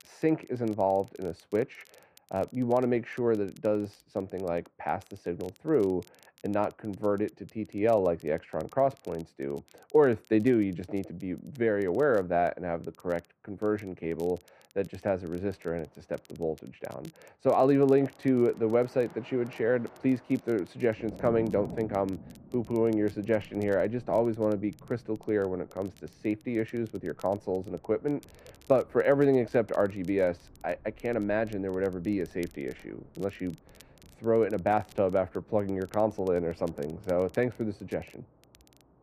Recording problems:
muffled; very; fading above 3 kHz
rain or running water; faint; from 16 s on; 20 dB below the speech
crackle, like an old record; faint; 30 dB below the speech

